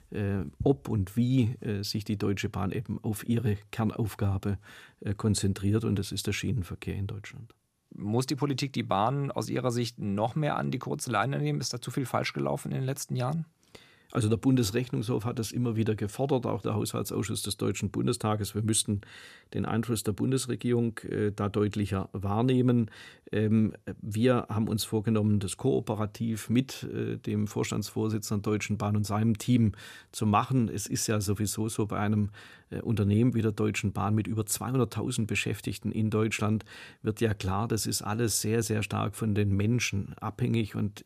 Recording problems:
none

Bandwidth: 14.5 kHz